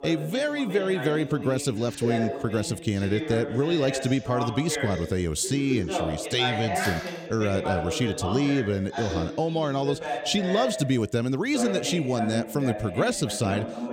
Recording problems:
voice in the background; loud; throughout; 6 dB below the speech
phone ringing; faint; at 7 s; peak 10 dB below the speech

